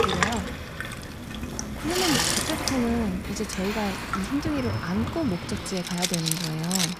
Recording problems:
household noises; very loud; throughout; 1 dB above the speech
animal sounds; noticeable; throughout; 10 dB below the speech
traffic noise; noticeable; throughout; 10 dB below the speech
crackling; faint; from 1 to 2.5 s and from 2.5 to 6 s; 20 dB below the speech

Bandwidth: 15 kHz